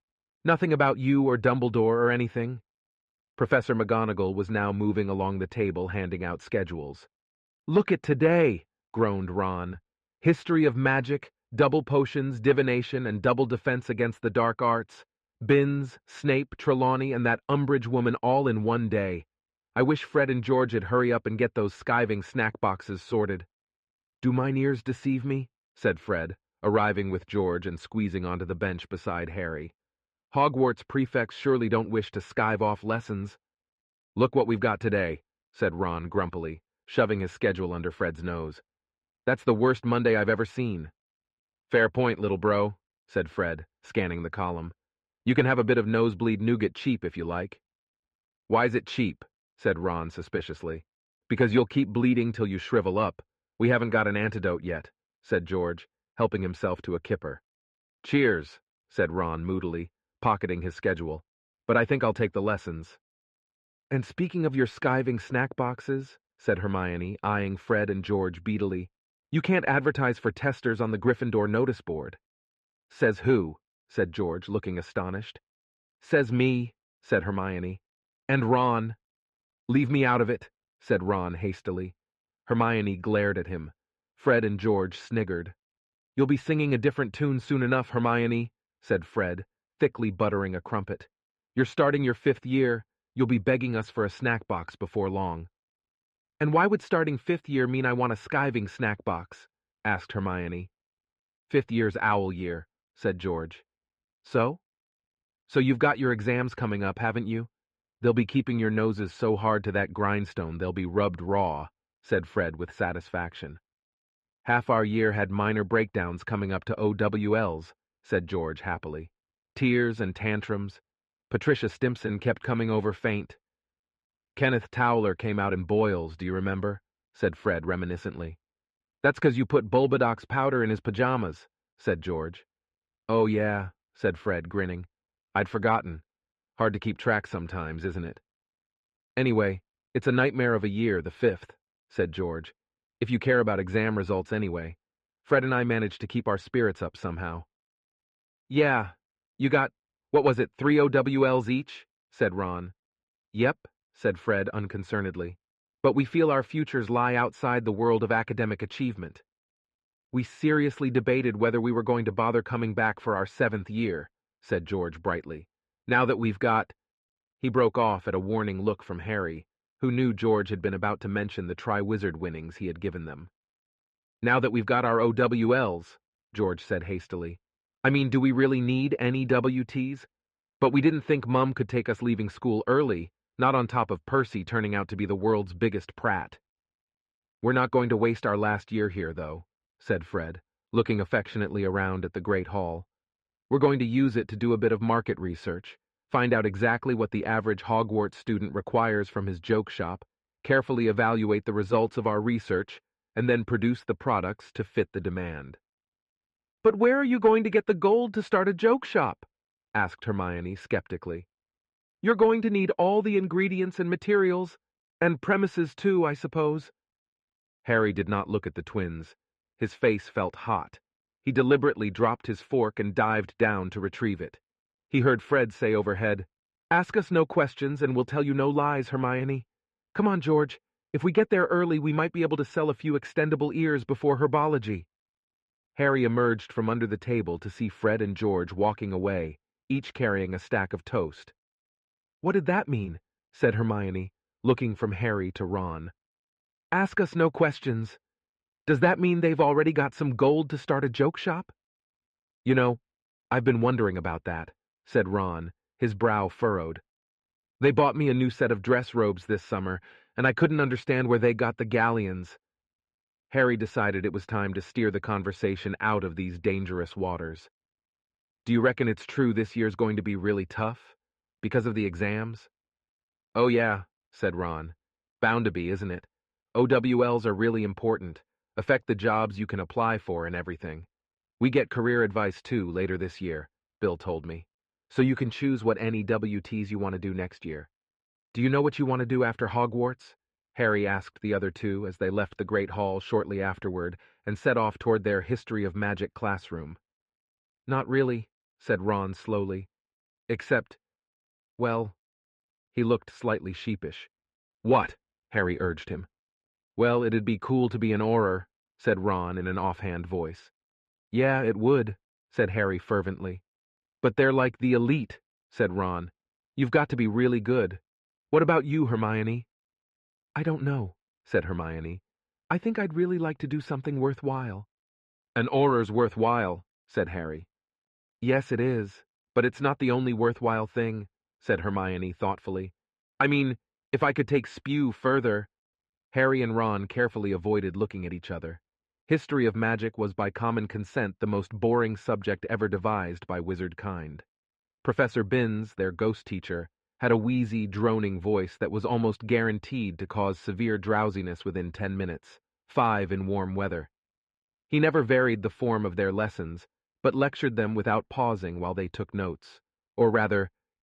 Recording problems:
muffled; very; fading above 3 kHz

